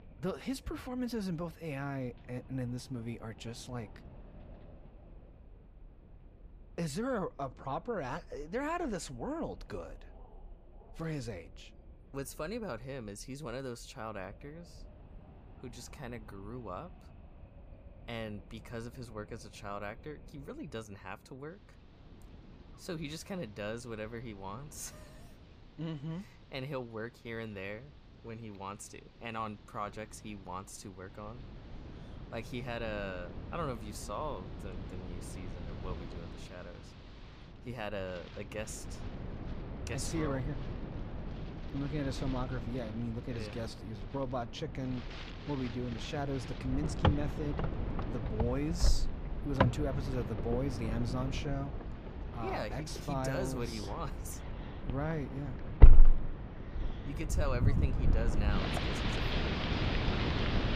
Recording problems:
wind in the background; very loud; throughout; 4 dB above the speech

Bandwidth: 15 kHz